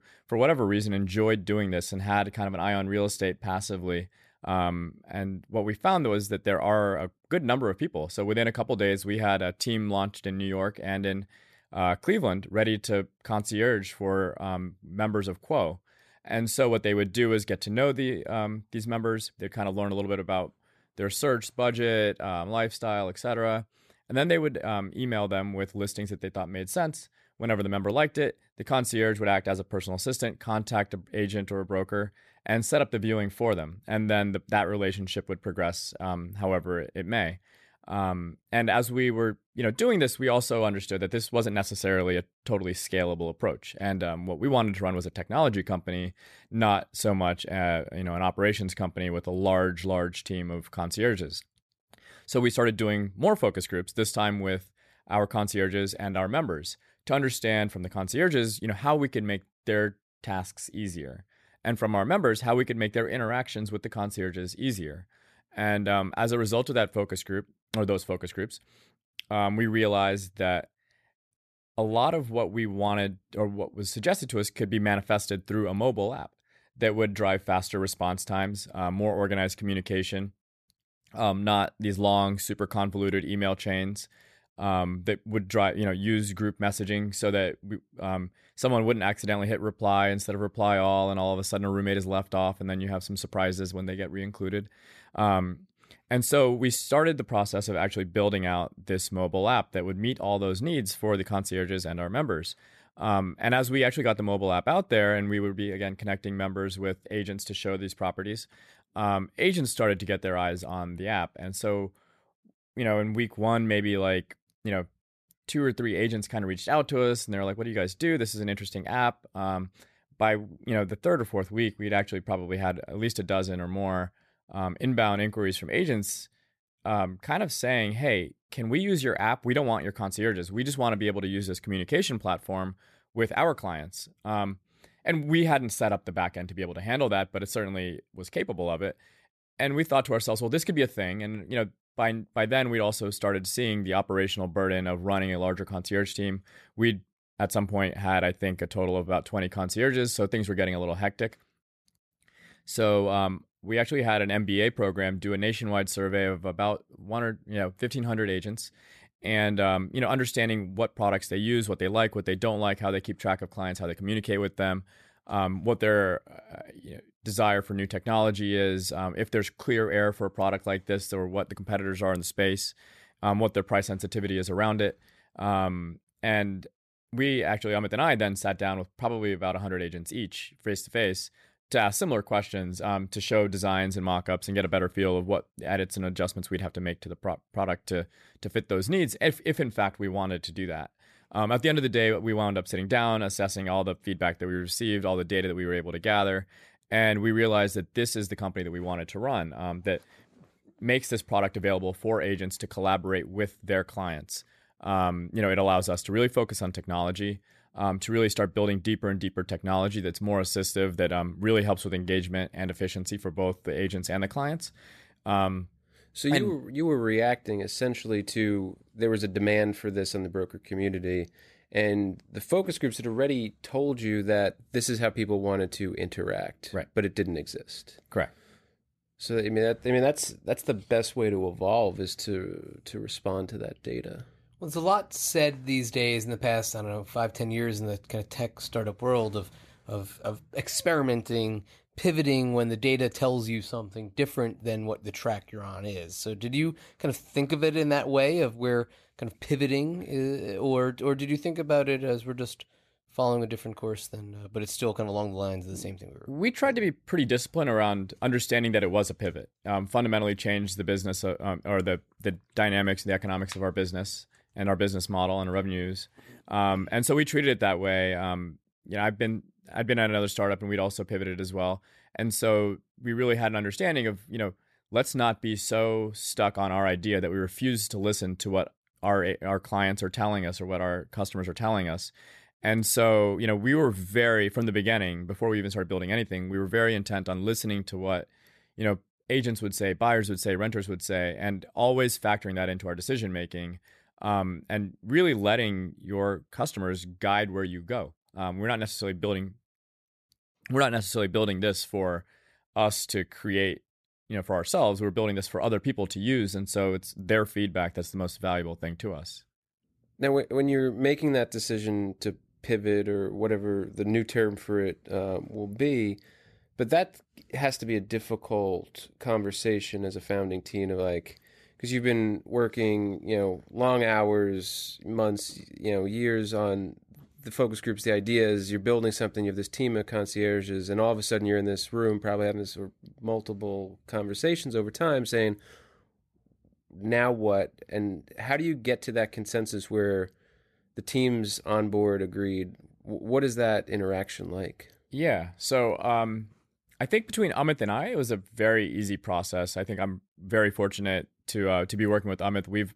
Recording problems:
none

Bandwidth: 14 kHz